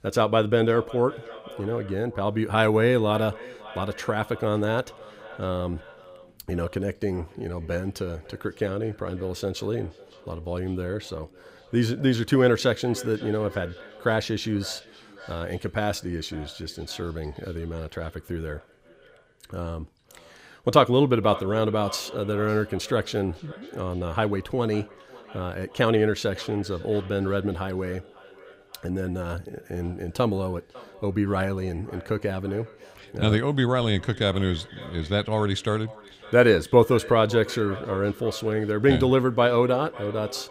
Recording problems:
echo of what is said; faint; throughout; 550 ms later, 20 dB below the speech

